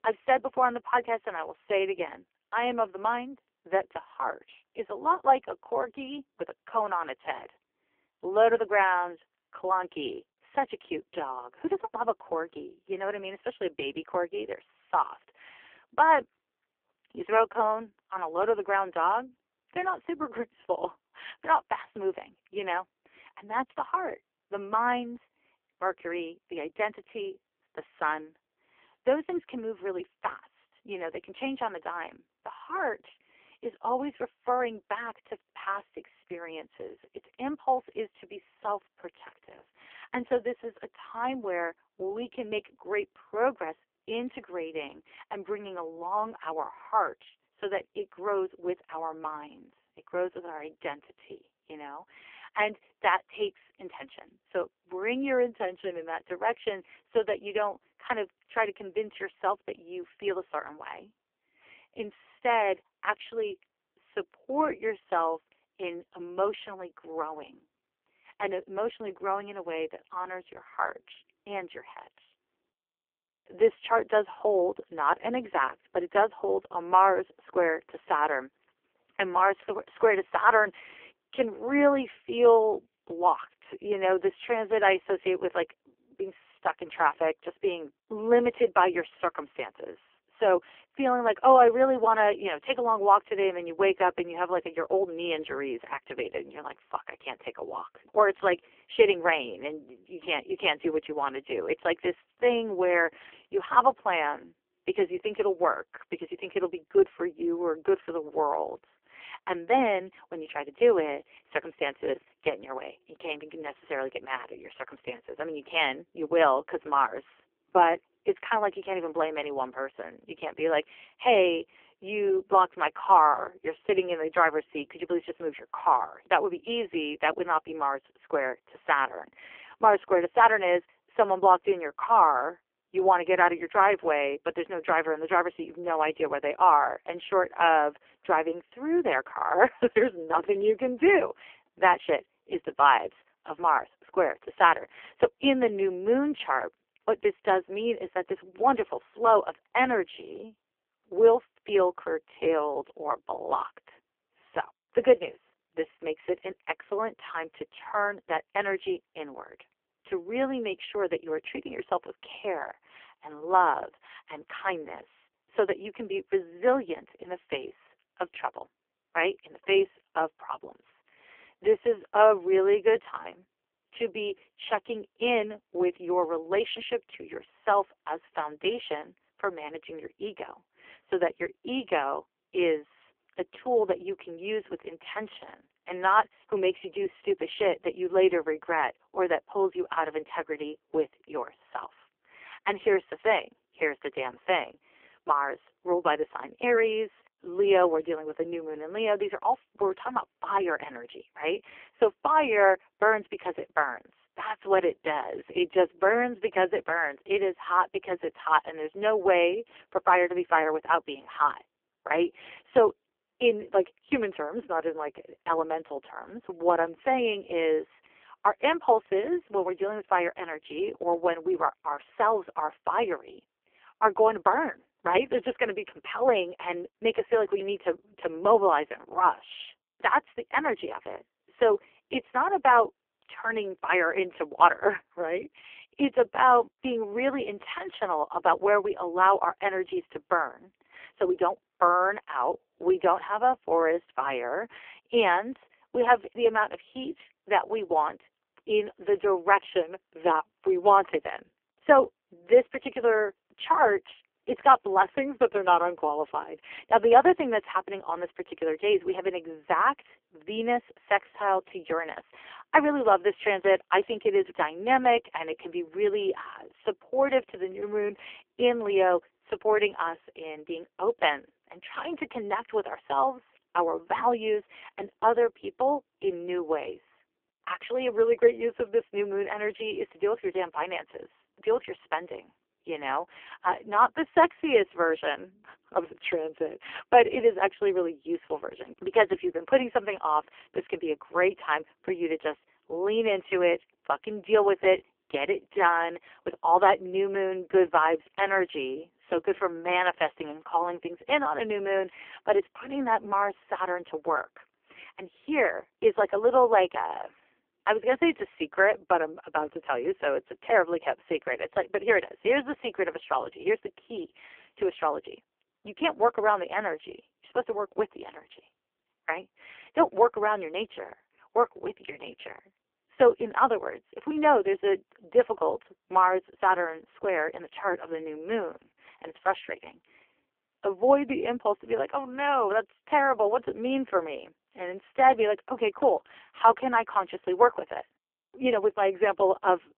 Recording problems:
phone-call audio; poor line; nothing above 3 kHz

